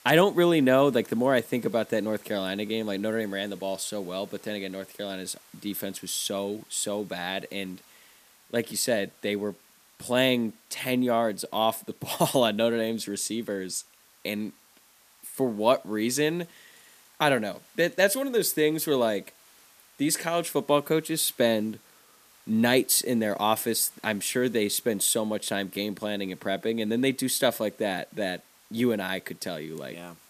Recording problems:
hiss; faint; throughout; 25 dB below the speech

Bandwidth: 14.5 kHz